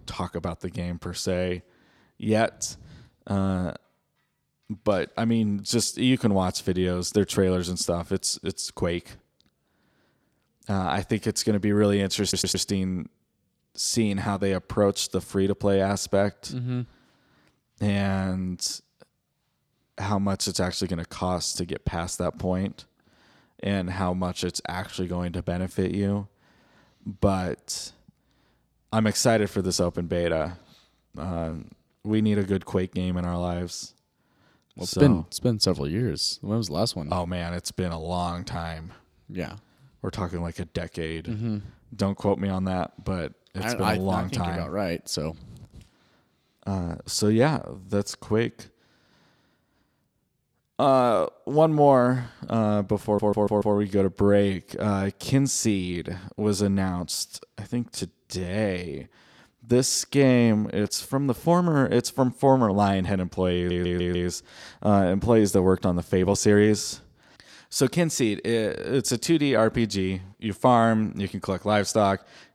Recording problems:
audio stuttering; at 12 s, at 53 s and at 1:04

